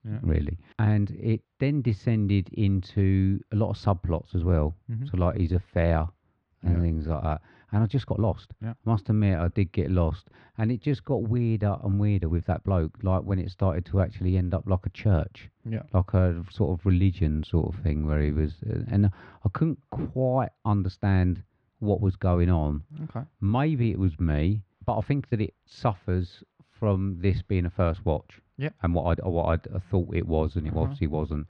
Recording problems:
muffled; slightly; fading above 3 kHz
uneven, jittery; strongly; from 4 to 29 s

